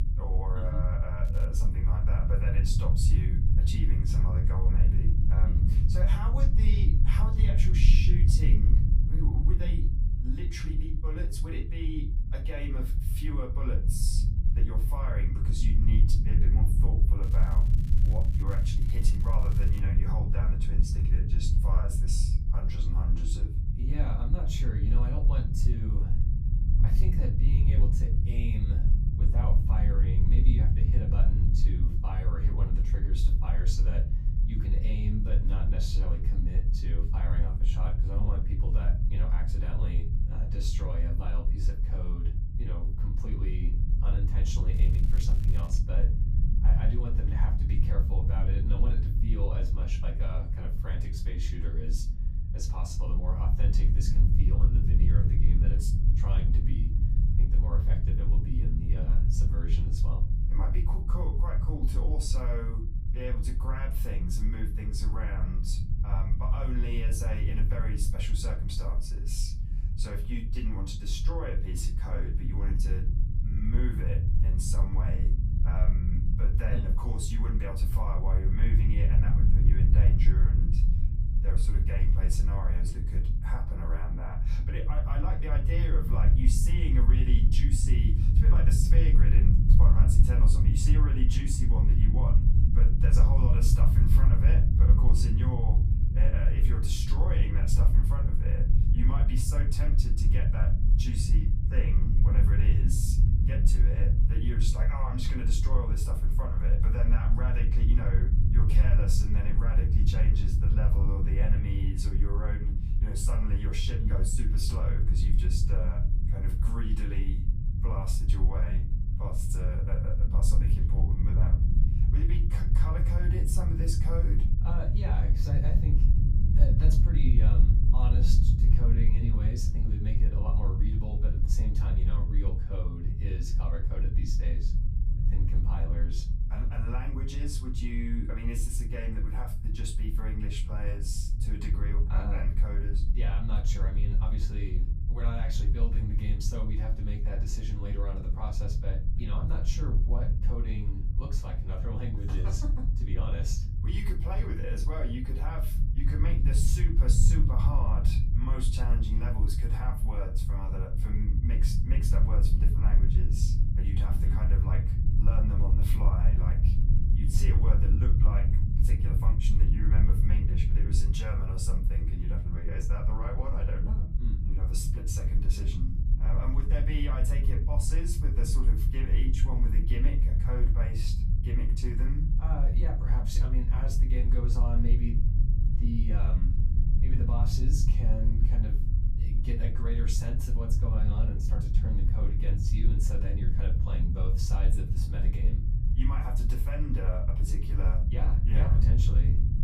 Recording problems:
off-mic speech; far
room echo; slight; dies away in 0.3 s
low rumble; loud; throughout; 2 dB below the speech
crackling; noticeable; at 1.5 s, from 17 to 20 s and from 45 to 46 s; 15 dB below the speech

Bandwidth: 15 kHz